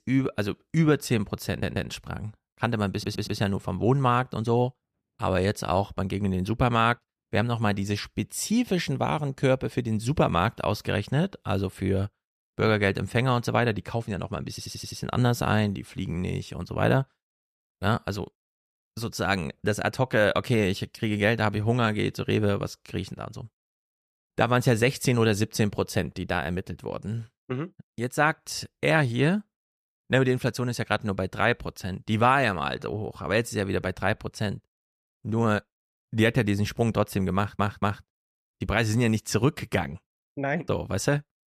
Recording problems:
audio stuttering; 4 times, first at 1.5 s

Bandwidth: 14.5 kHz